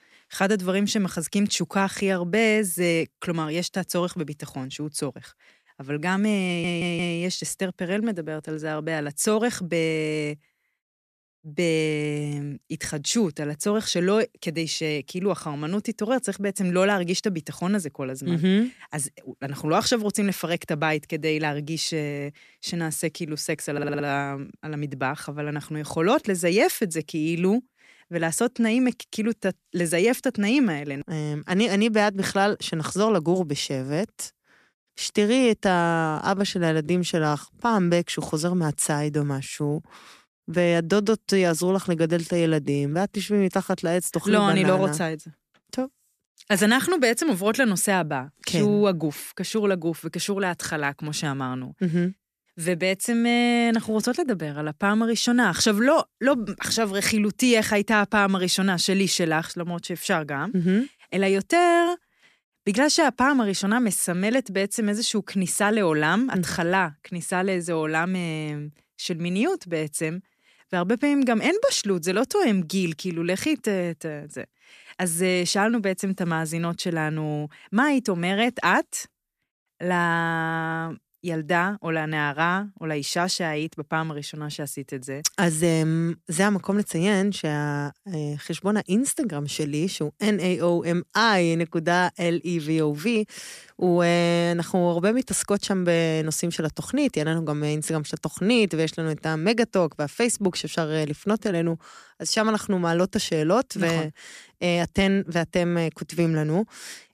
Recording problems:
audio stuttering; at 6.5 s and at 24 s

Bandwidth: 14.5 kHz